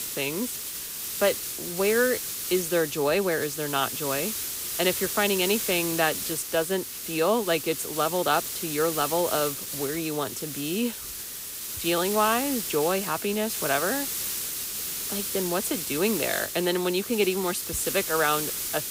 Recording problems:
hiss; loud; throughout; 3 dB below the speech

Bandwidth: 15.5 kHz